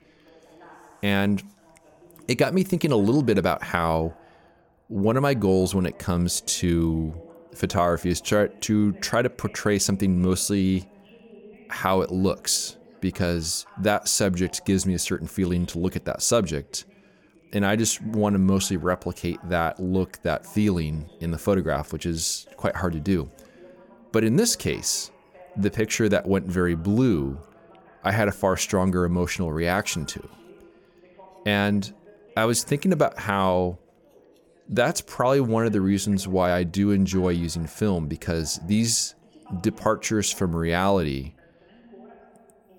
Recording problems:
voice in the background; faint; throughout; 30 dB below the speech

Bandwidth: 17.5 kHz